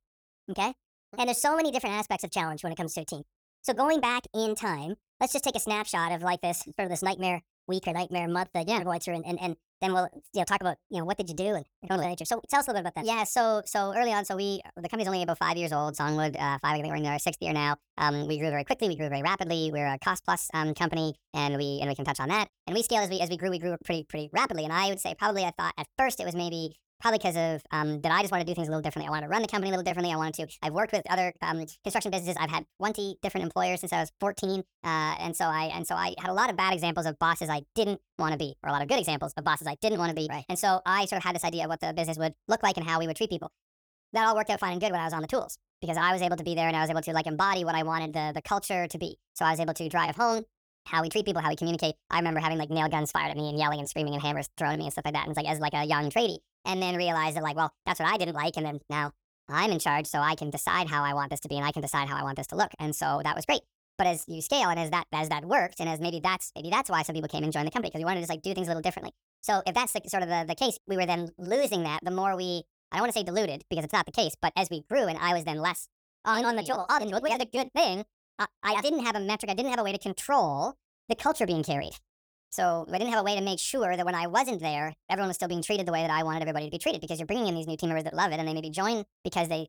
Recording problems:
wrong speed and pitch; too fast and too high; 1.5 times normal speed

